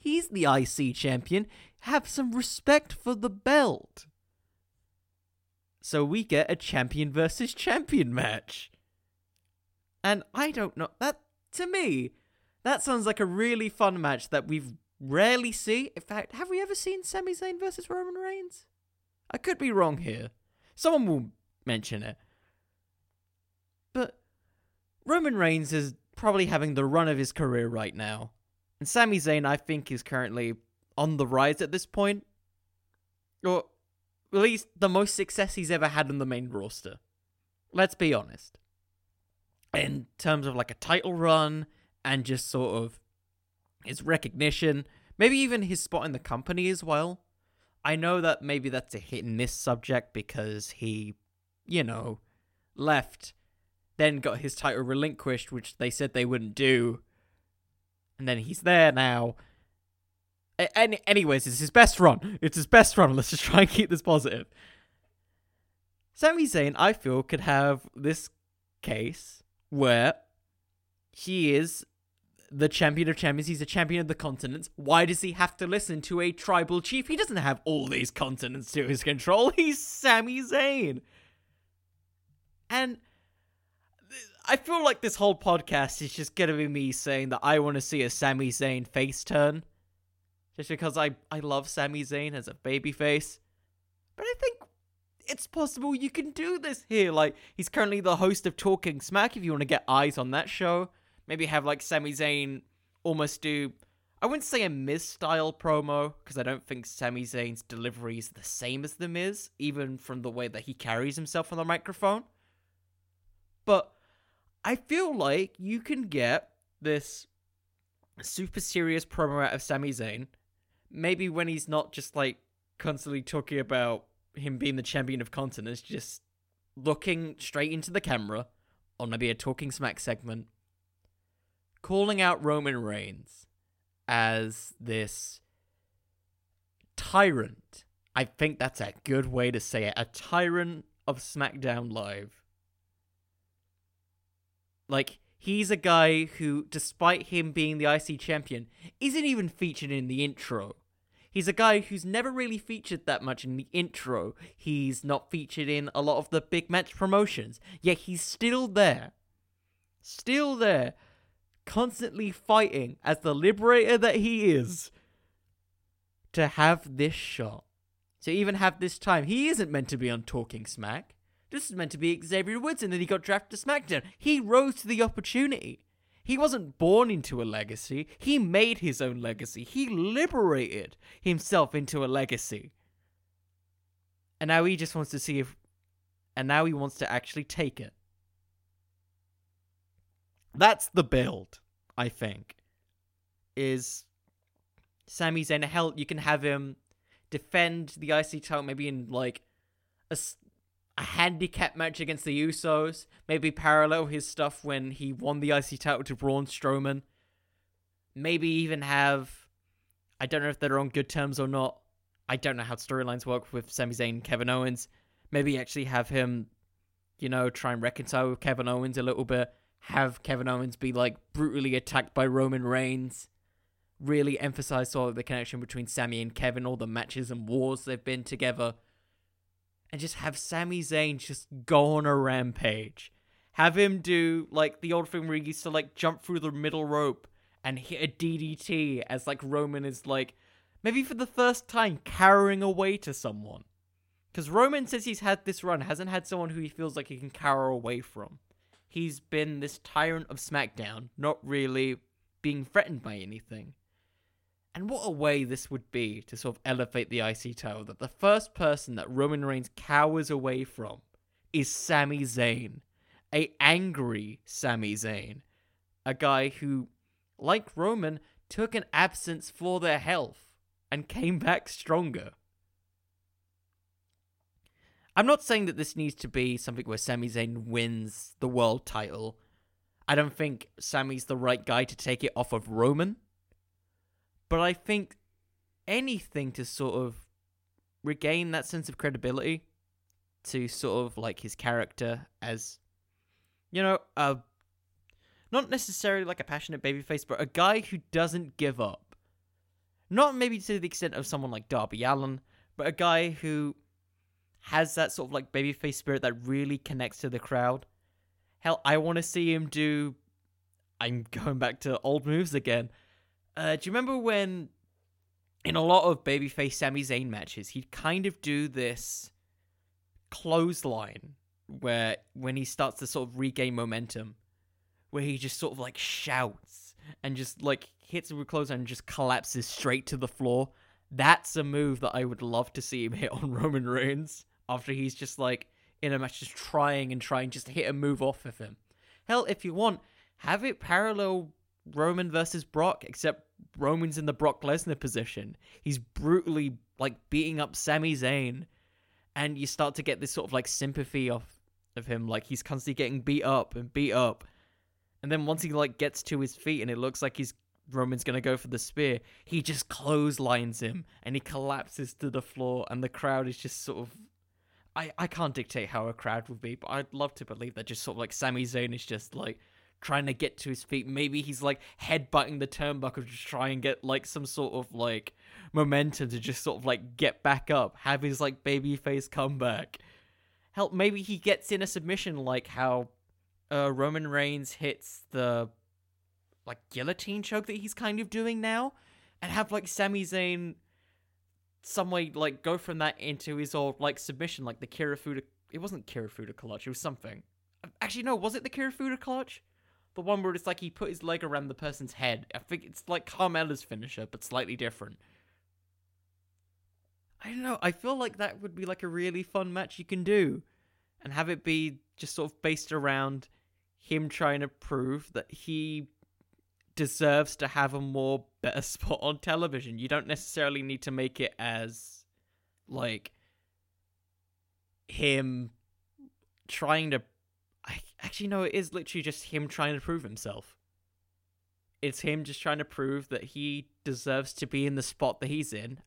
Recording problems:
none

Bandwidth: 16.5 kHz